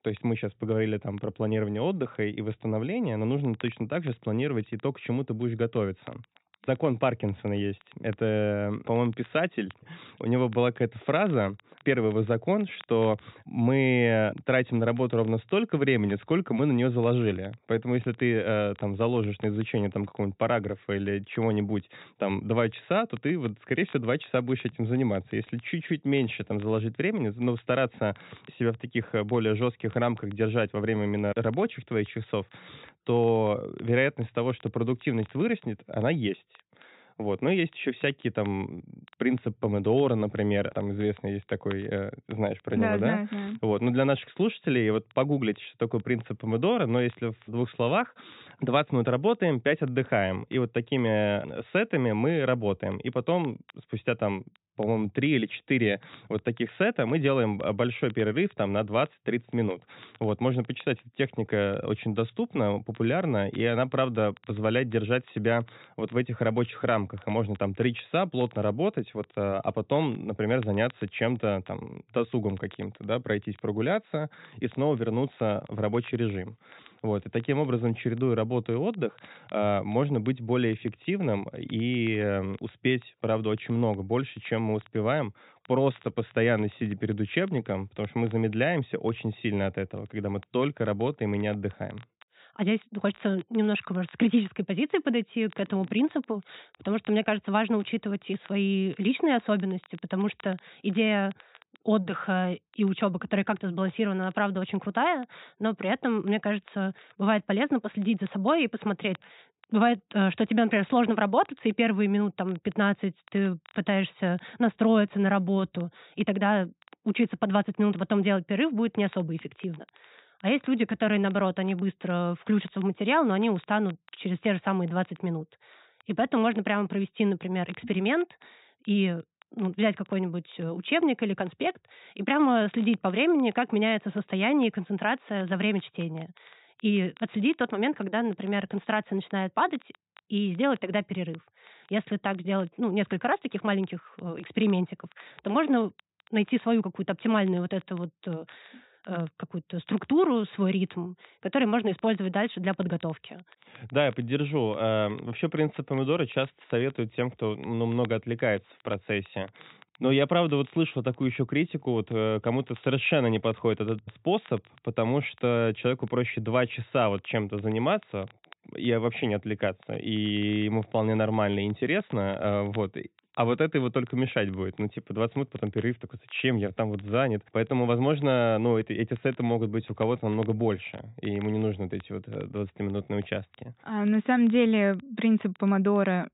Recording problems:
high frequencies cut off; severe; nothing above 4 kHz
crackle, like an old record; faint; 30 dB below the speech

